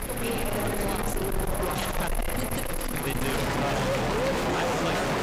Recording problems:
distortion; heavy; 7 dB below the speech
animal sounds; very loud; throughout; 3 dB above the speech
murmuring crowd; very loud; throughout; 4 dB above the speech
hiss; faint; throughout; 25 dB below the speech

